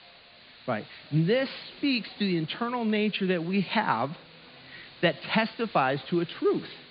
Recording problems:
high frequencies cut off; severe; nothing above 4.5 kHz
chatter from many people; faint; throughout; 30 dB below the speech
hiss; faint; throughout; 20 dB below the speech

